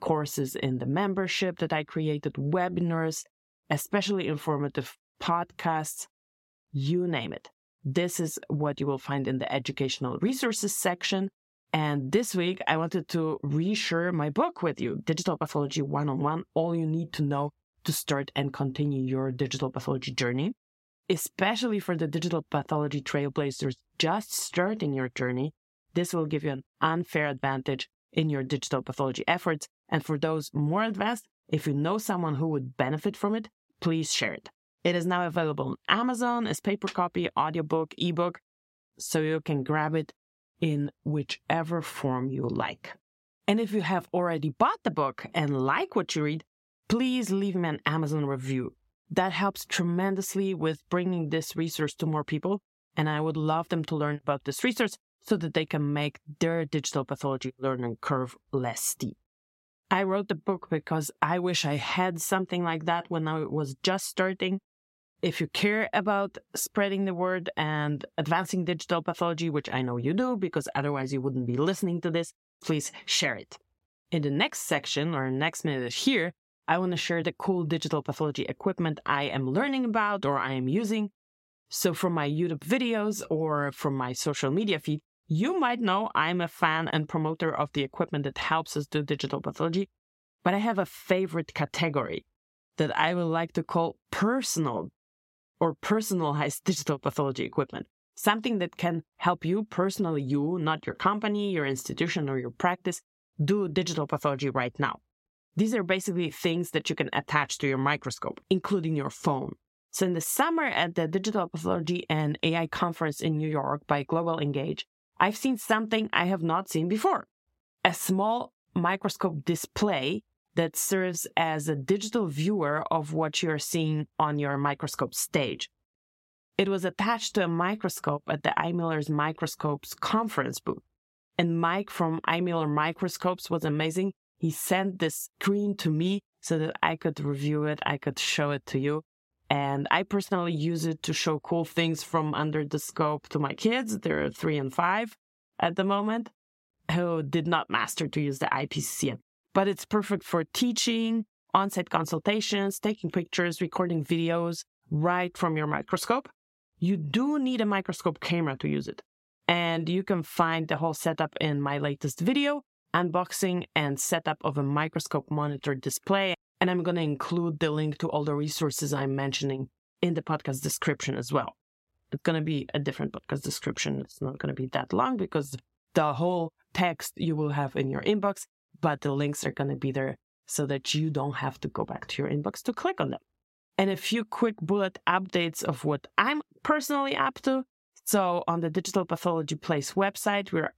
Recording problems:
squashed, flat; somewhat

